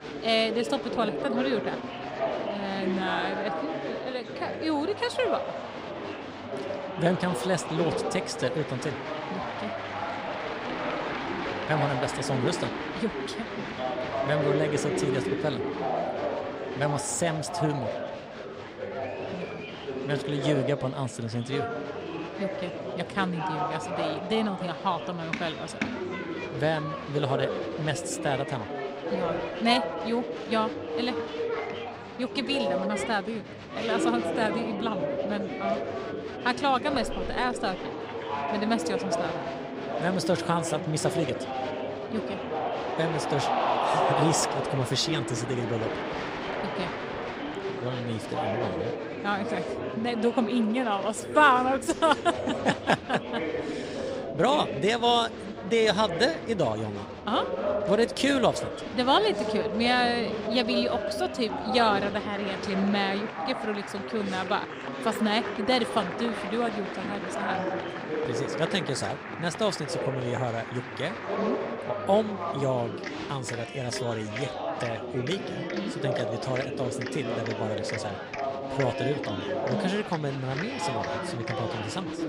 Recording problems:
chatter from many people; loud; throughout; 3 dB below the speech

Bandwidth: 15.5 kHz